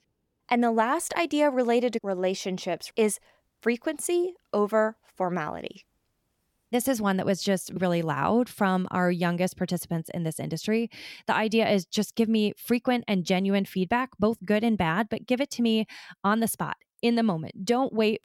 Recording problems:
none

